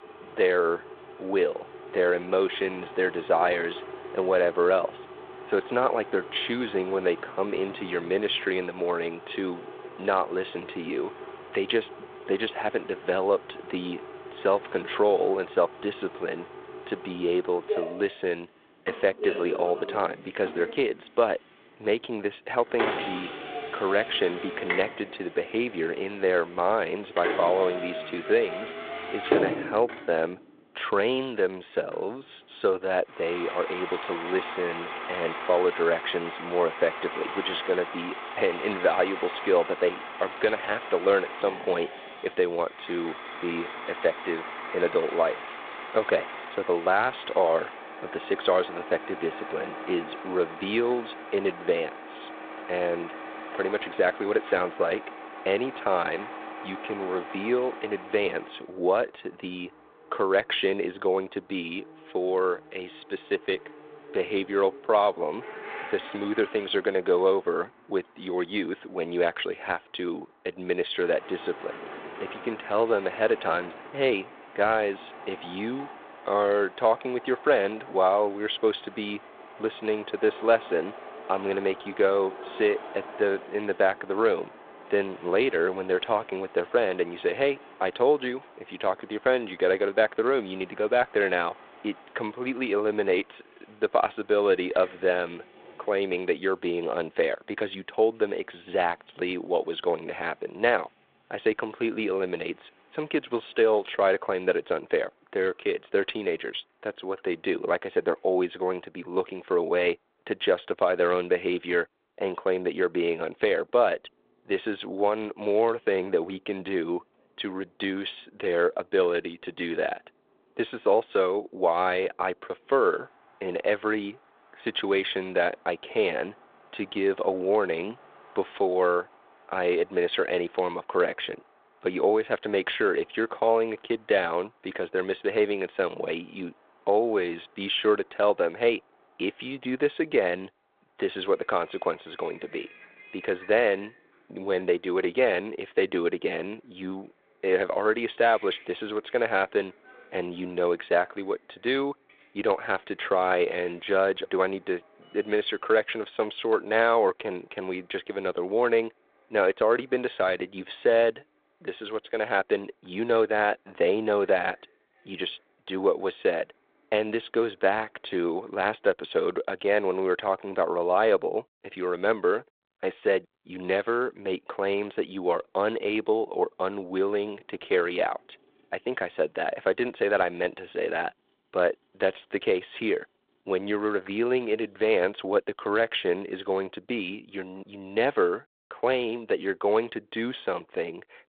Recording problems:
phone-call audio; nothing above 3.5 kHz
traffic noise; noticeable; throughout; 10 dB below the speech

